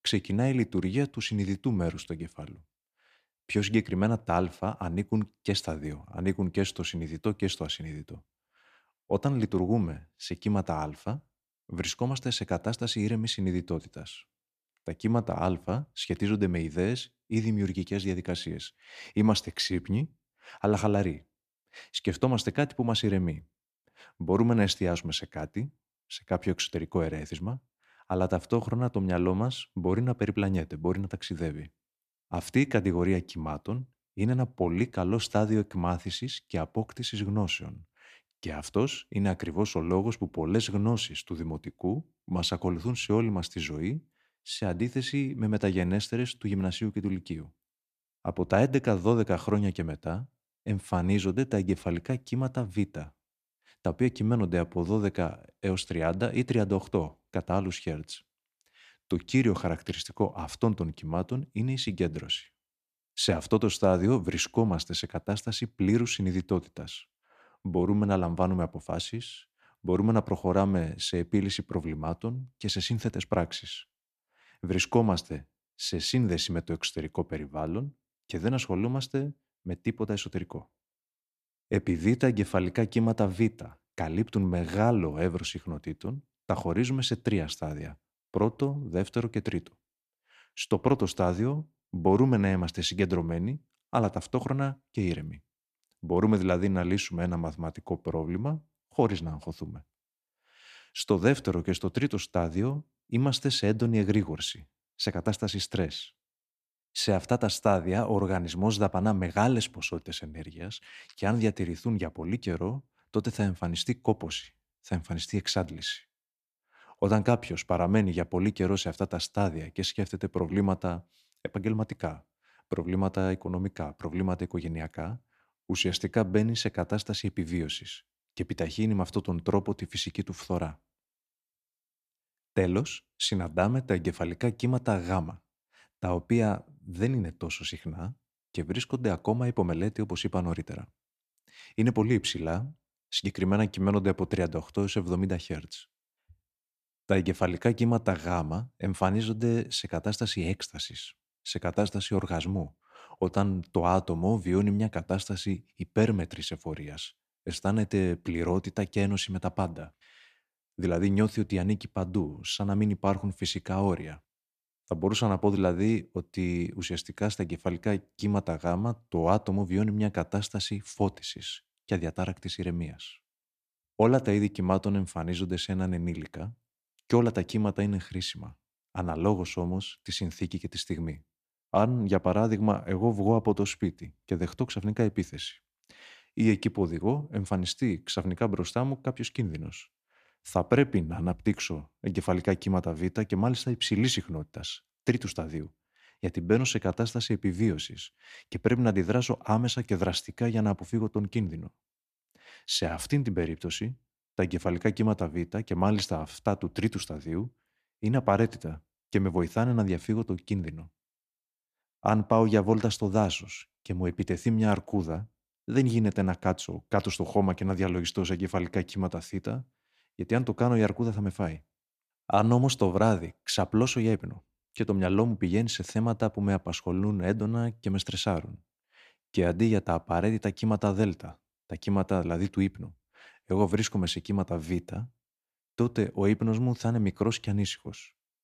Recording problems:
none

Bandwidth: 14.5 kHz